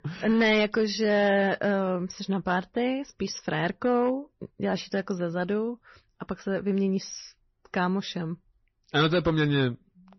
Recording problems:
distortion; slight; 3% of the sound clipped
garbled, watery; slightly; nothing above 6 kHz

